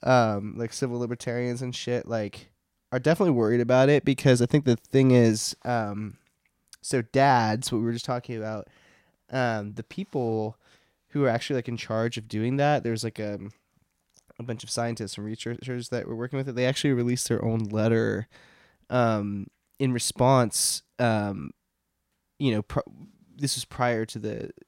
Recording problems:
none

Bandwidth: 16 kHz